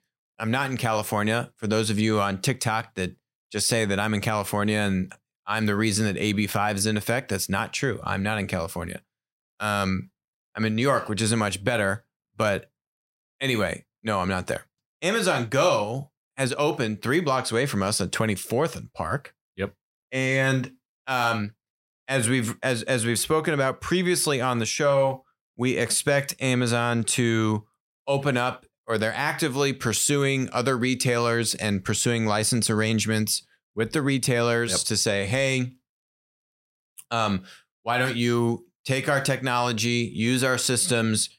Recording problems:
none

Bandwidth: 16 kHz